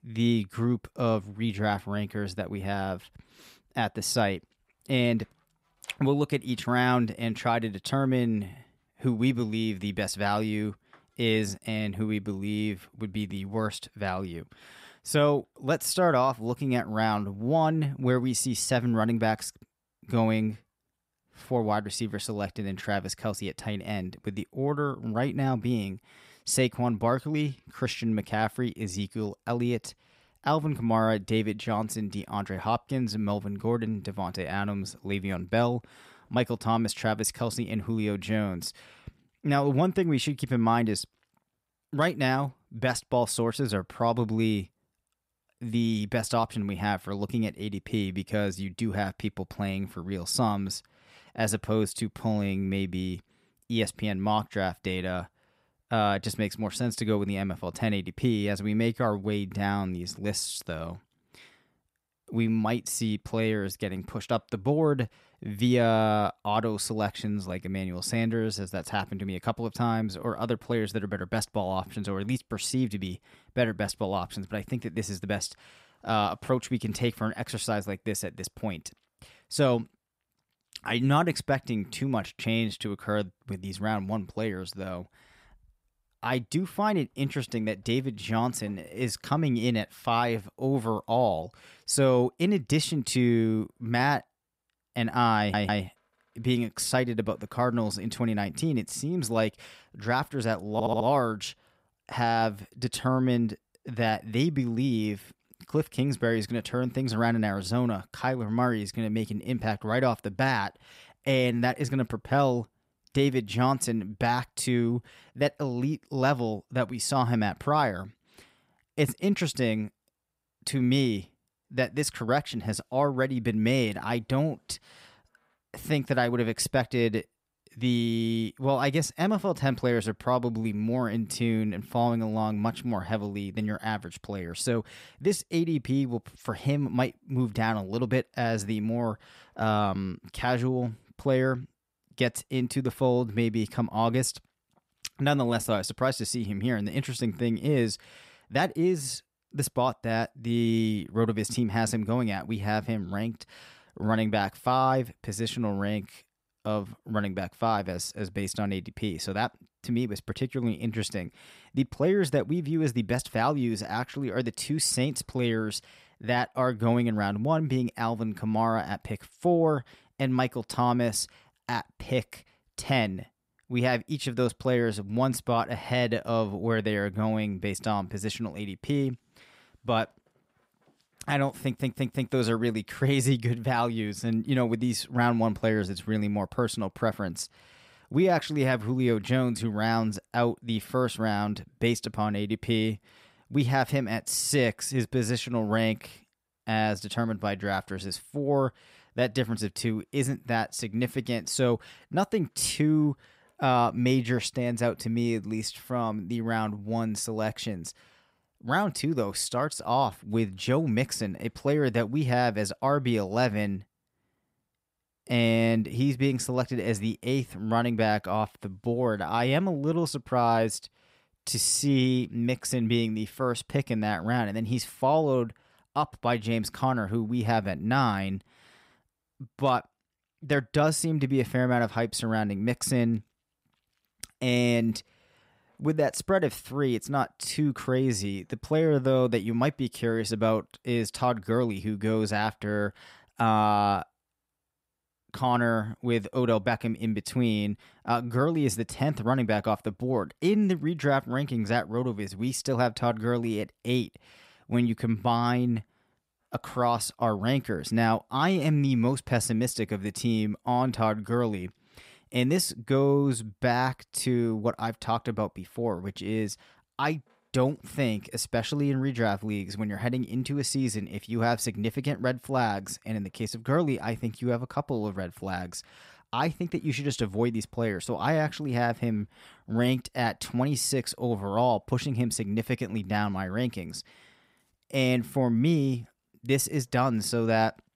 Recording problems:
audio stuttering; at 1:35, at 1:41 and at 3:02

